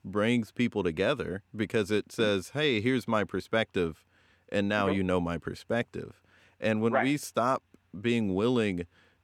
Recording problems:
none

